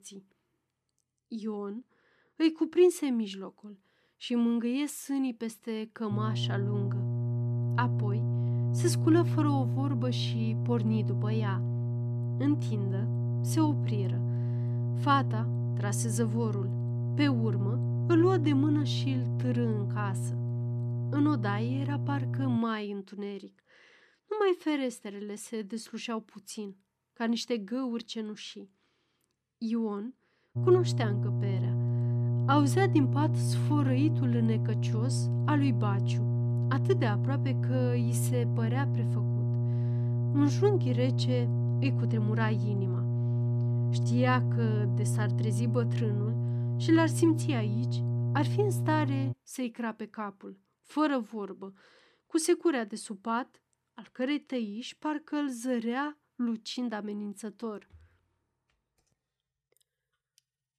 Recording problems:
electrical hum; loud; from 6 to 23 s and from 31 to 49 s; 60 Hz, 7 dB below the speech

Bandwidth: 13.5 kHz